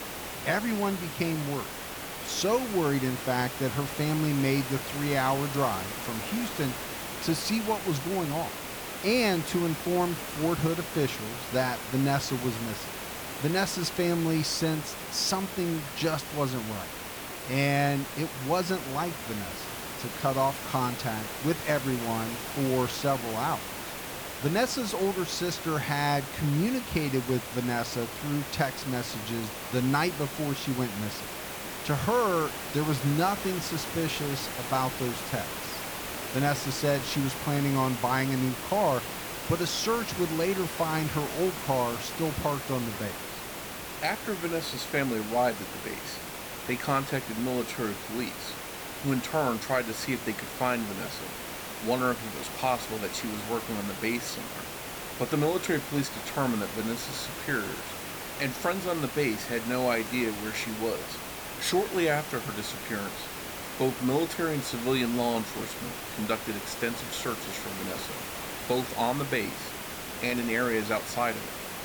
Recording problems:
hiss; loud; throughout; 6 dB below the speech

